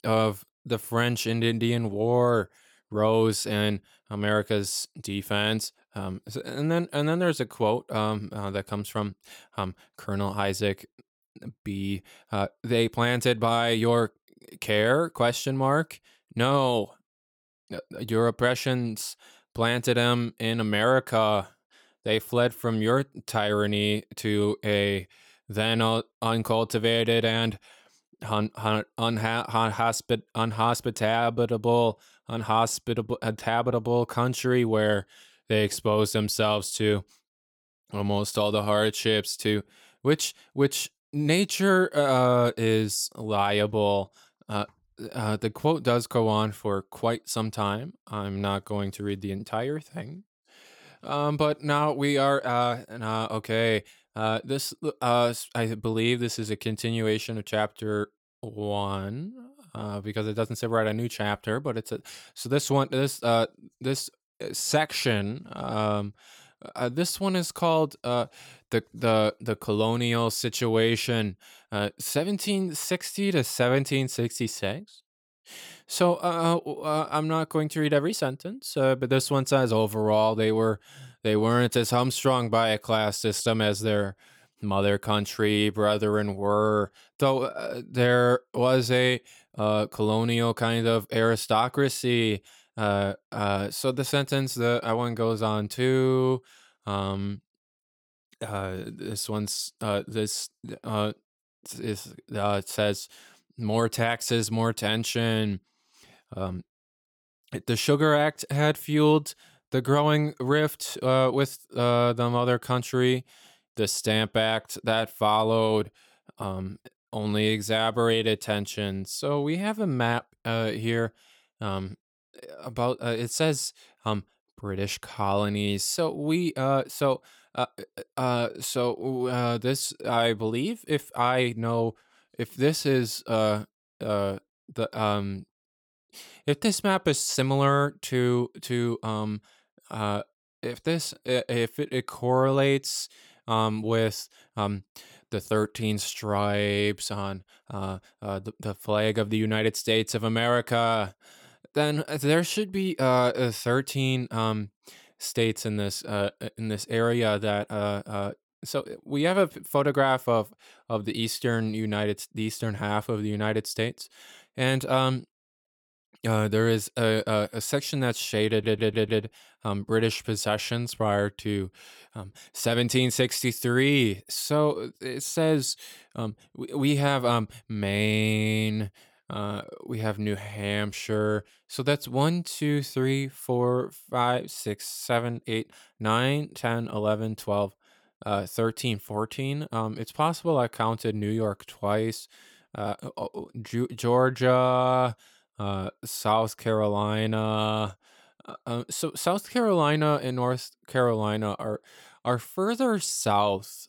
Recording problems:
audio stuttering; at 2:48

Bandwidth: 17.5 kHz